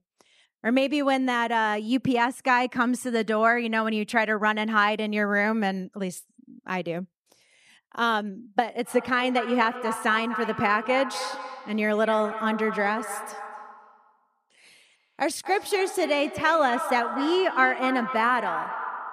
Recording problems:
echo of what is said; strong; from 9 s on; 250 ms later, 9 dB below the speech

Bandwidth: 14.5 kHz